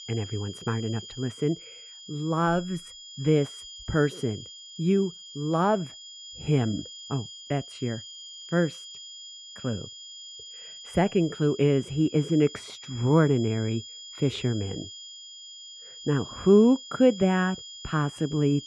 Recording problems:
muffled; slightly; fading above 4 kHz
high-pitched whine; noticeable; throughout; 3.5 kHz, 15 dB below the speech

